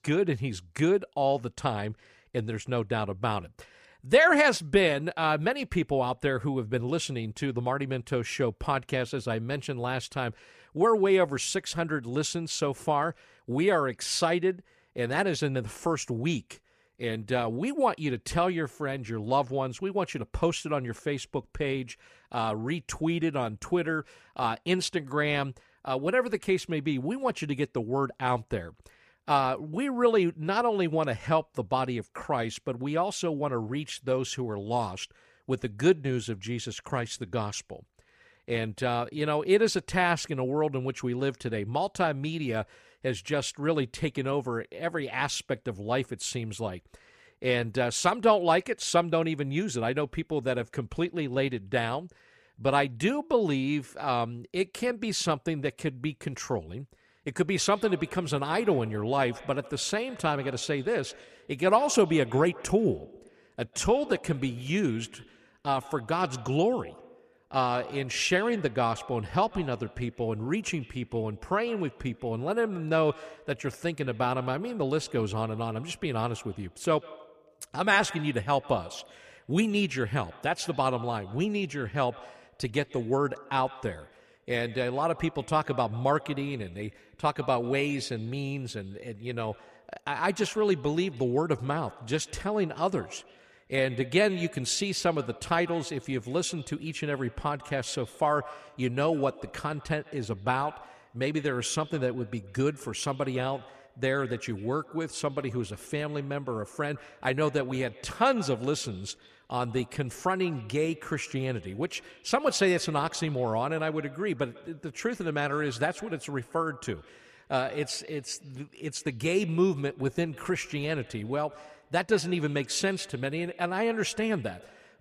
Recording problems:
echo of what is said; faint; from 58 s on; 140 ms later, 20 dB below the speech

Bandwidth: 14.5 kHz